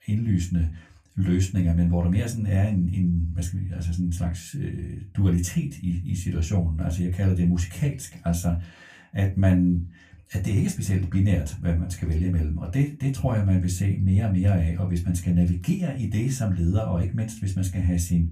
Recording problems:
room echo; very slight; dies away in 0.2 s
off-mic speech; somewhat distant

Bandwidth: 15 kHz